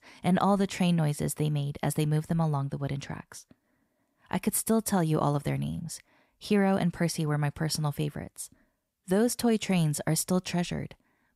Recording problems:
none

